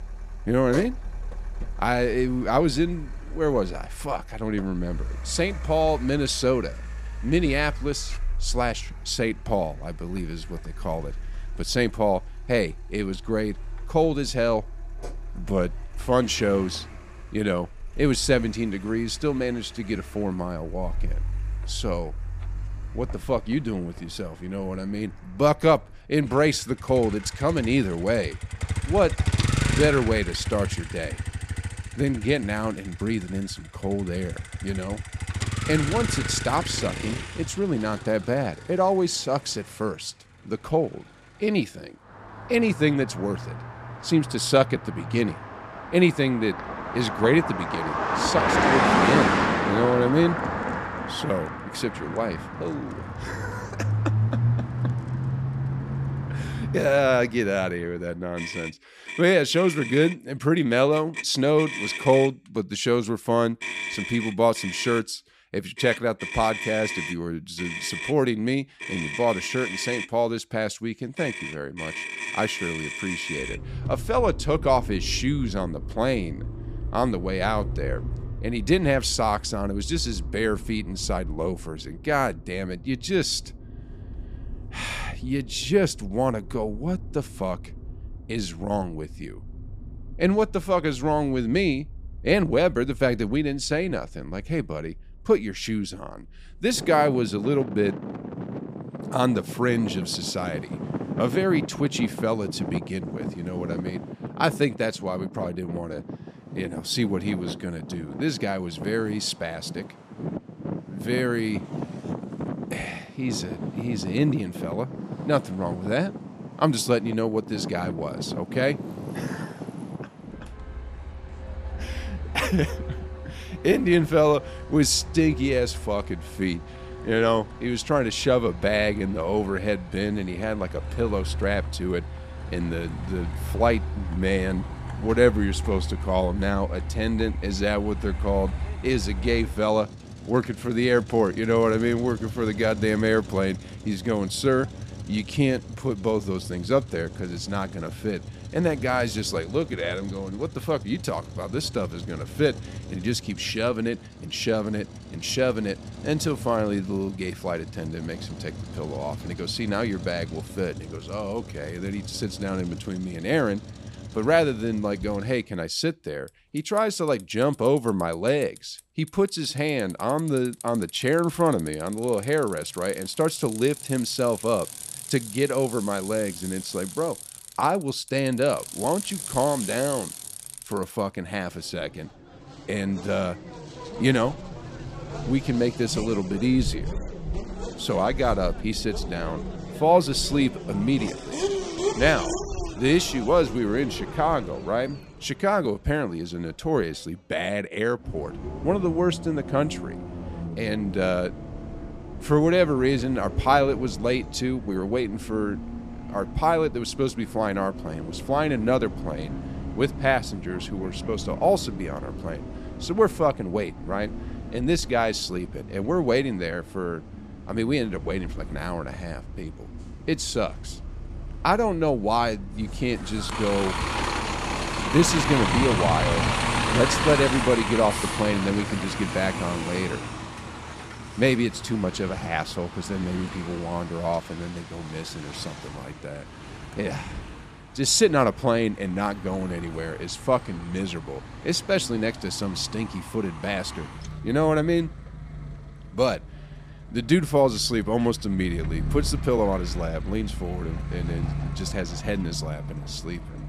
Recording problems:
traffic noise; loud; throughout; 8 dB below the speech

